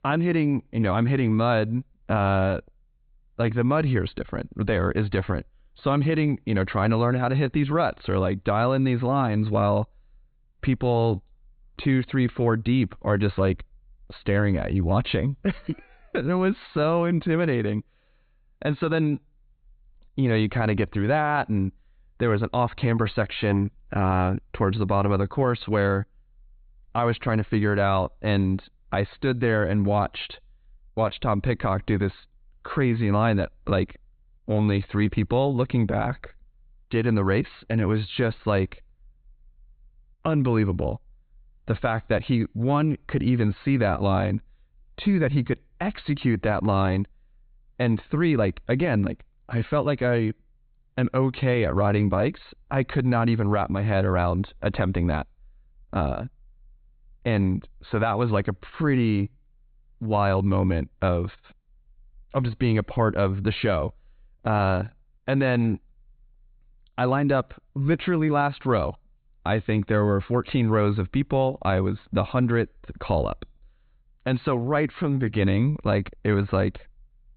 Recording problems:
high frequencies cut off; severe; nothing above 4 kHz

